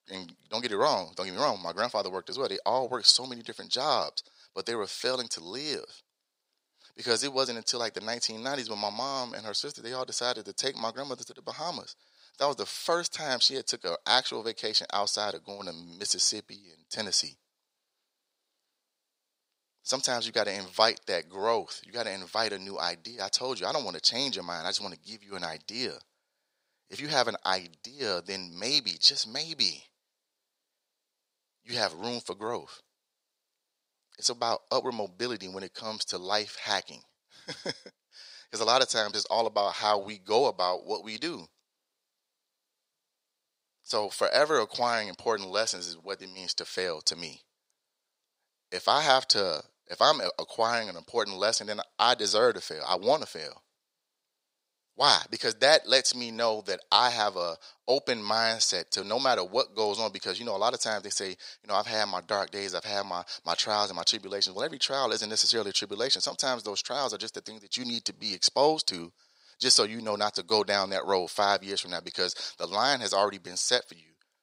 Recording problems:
thin; very; fading below 500 Hz

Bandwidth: 15.5 kHz